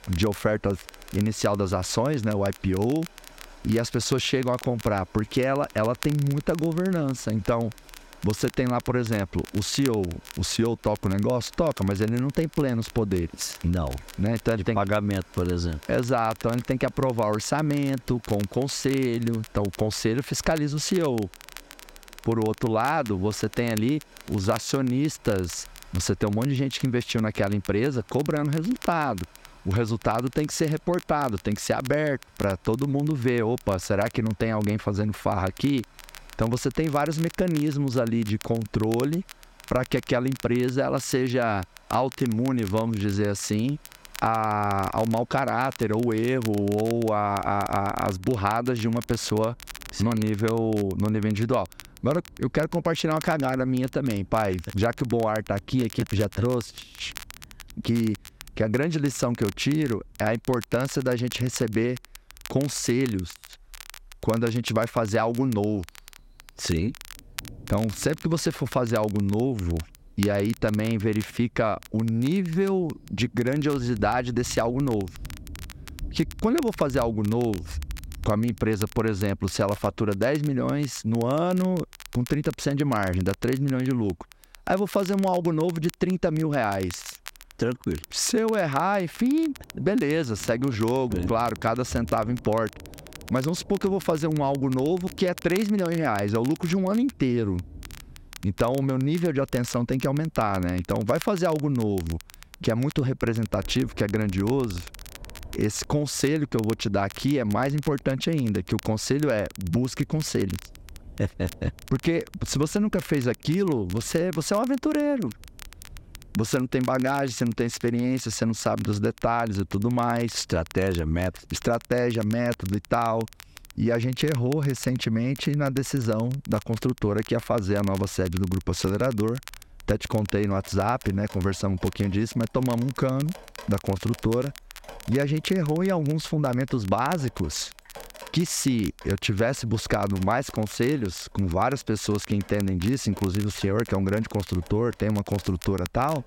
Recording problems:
squashed, flat; somewhat, background pumping
crackle, like an old record; noticeable; 20 dB below the speech
rain or running water; faint; throughout; 25 dB below the speech

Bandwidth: 16 kHz